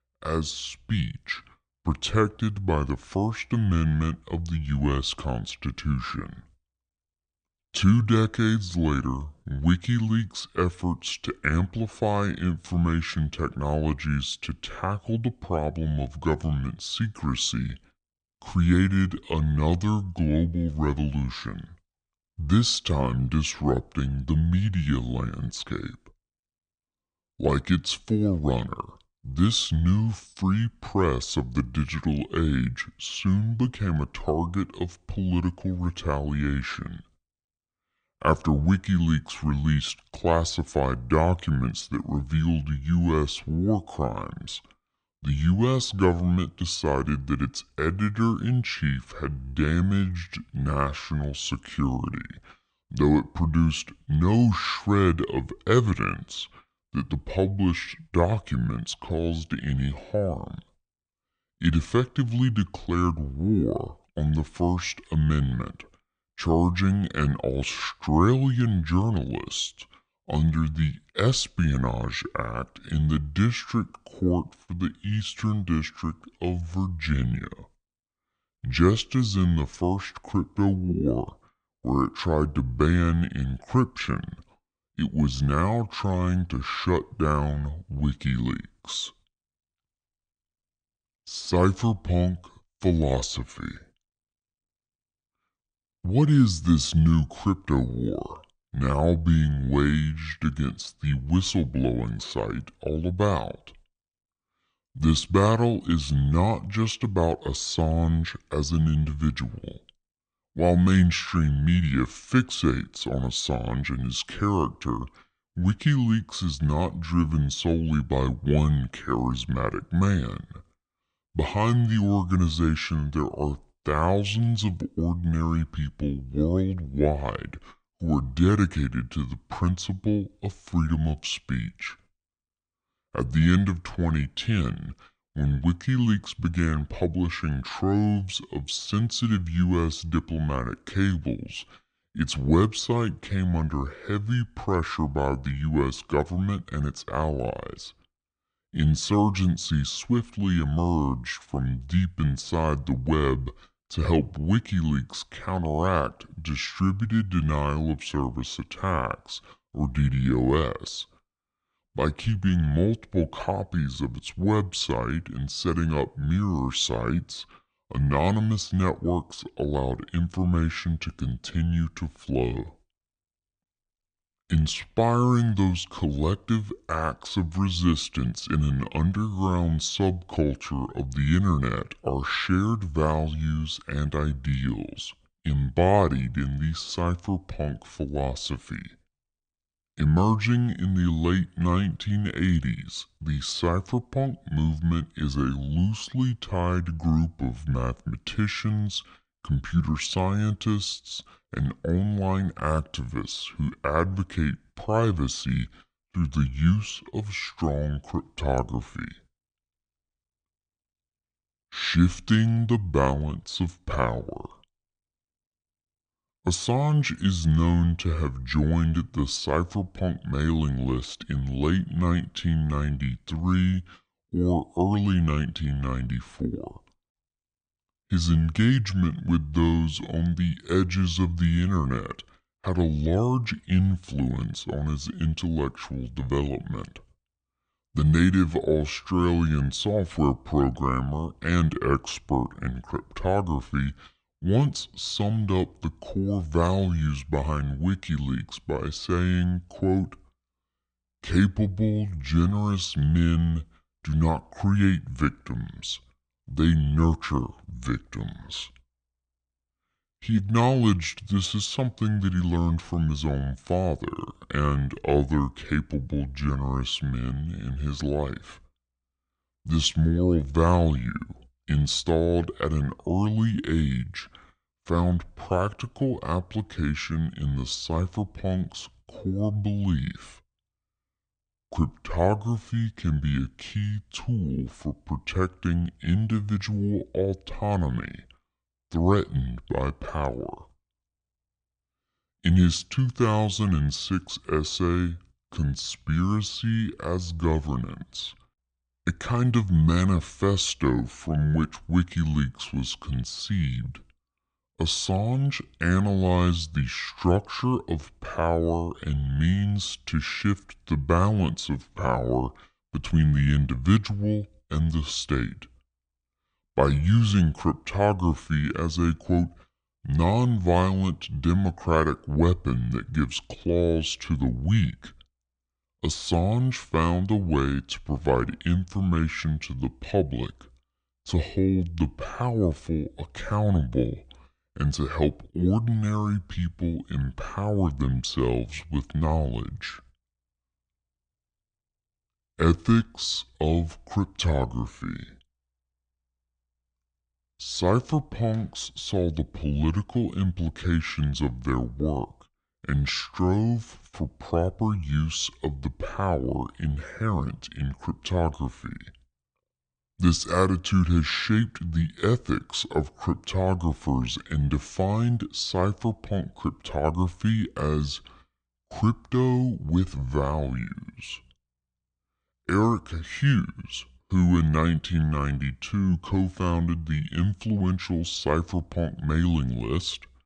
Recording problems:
wrong speed and pitch; too slow and too low; 0.7 times normal speed

